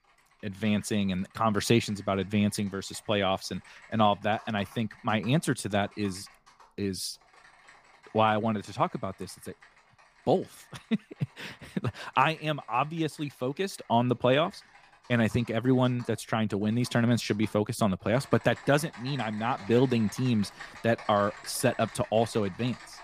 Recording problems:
household noises; faint; throughout; 20 dB below the speech

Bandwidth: 15 kHz